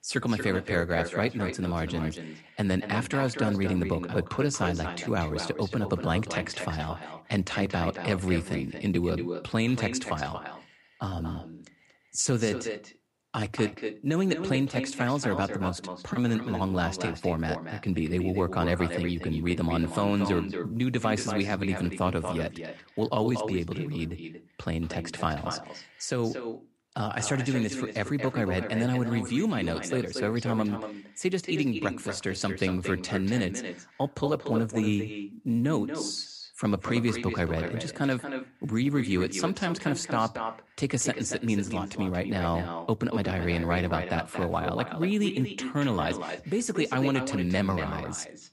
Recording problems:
echo of what is said; strong; throughout; 230 ms later, 8 dB below the speech

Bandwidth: 15.5 kHz